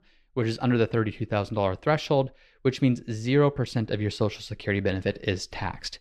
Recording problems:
muffled; slightly; fading above 2 kHz

